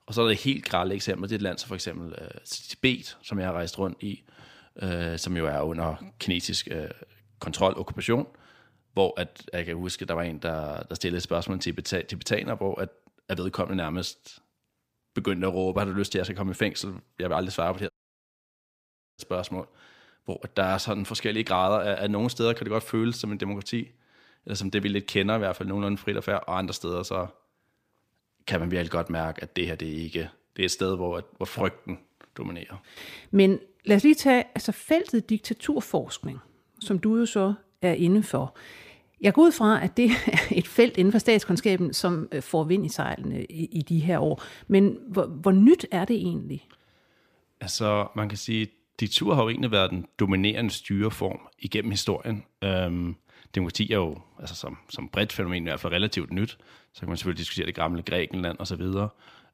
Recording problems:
audio cutting out; at 18 s for 1.5 s

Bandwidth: 15 kHz